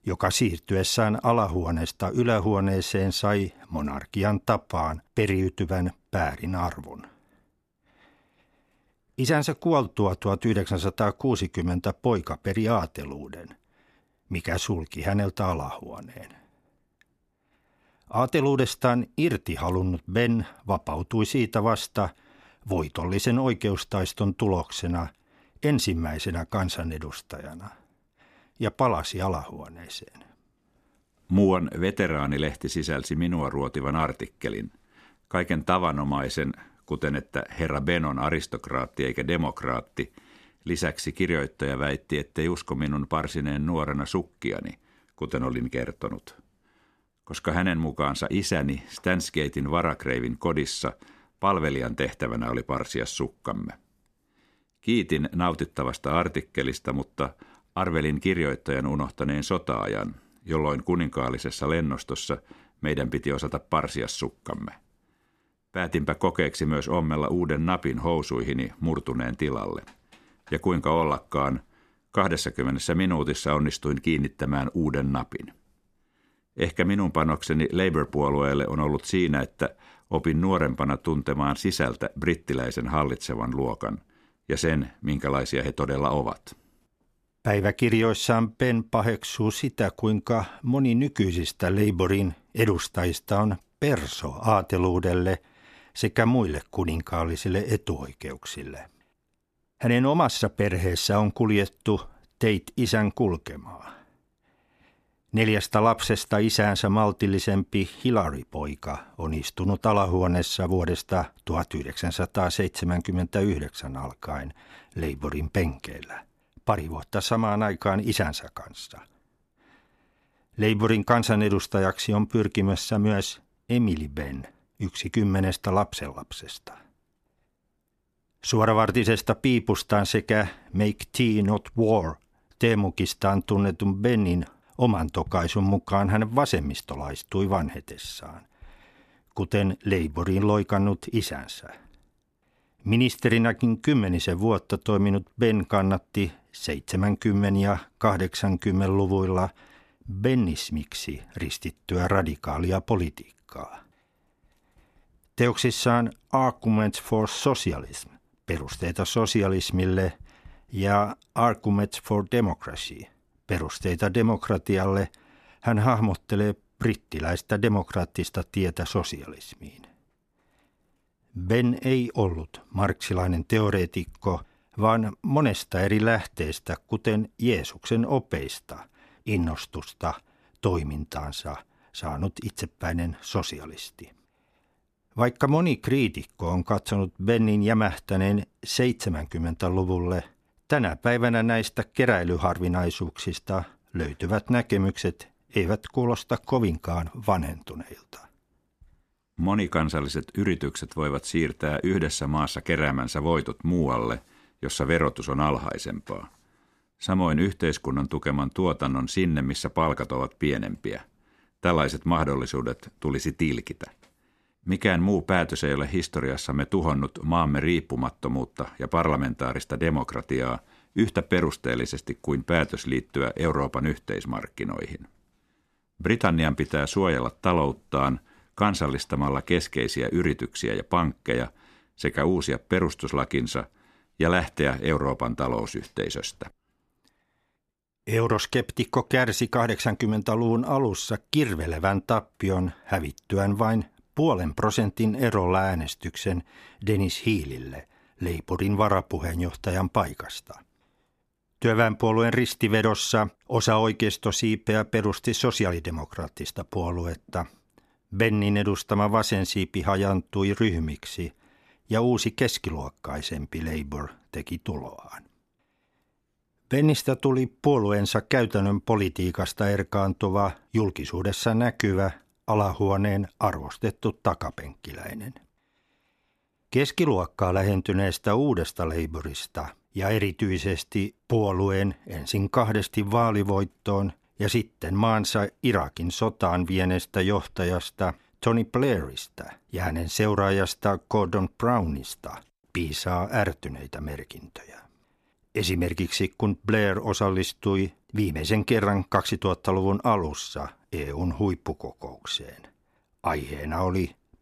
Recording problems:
none

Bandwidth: 14.5 kHz